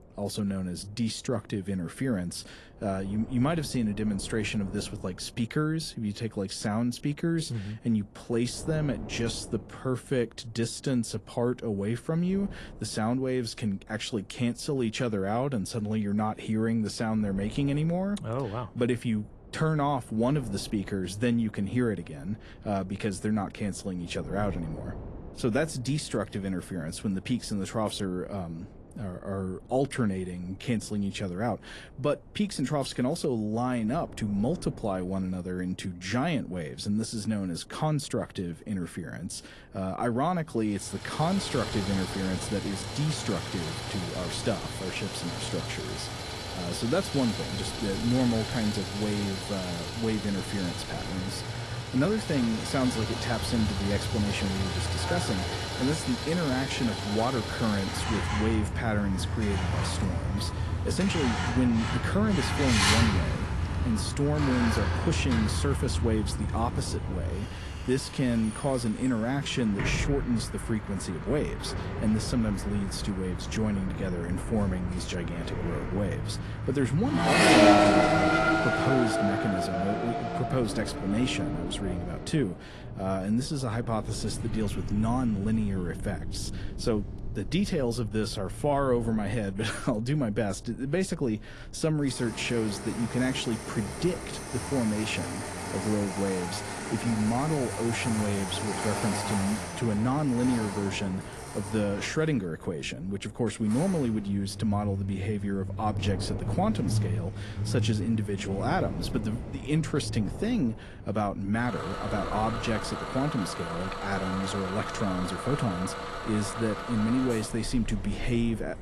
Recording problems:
garbled, watery; slightly; nothing above 11 kHz
traffic noise; loud; from 41 s on; 2 dB below the speech
wind noise on the microphone; occasional gusts; 20 dB below the speech

